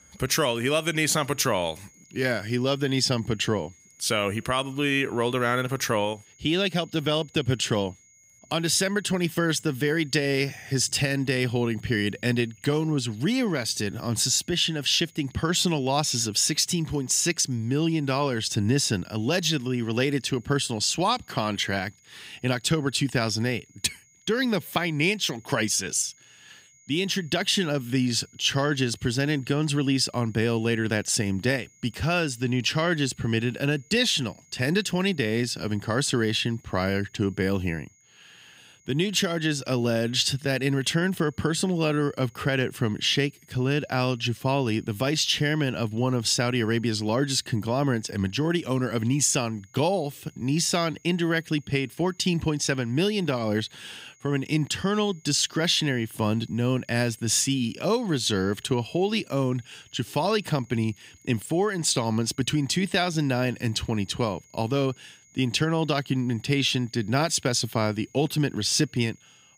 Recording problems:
high-pitched whine; faint; throughout; 6.5 kHz, 30 dB below the speech

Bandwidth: 15.5 kHz